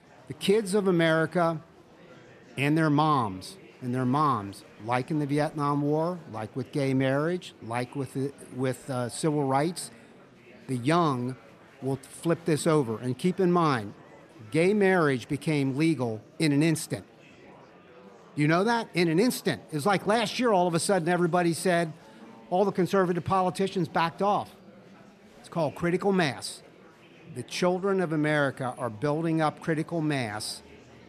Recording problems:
murmuring crowd; faint; throughout; 25 dB below the speech

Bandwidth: 14 kHz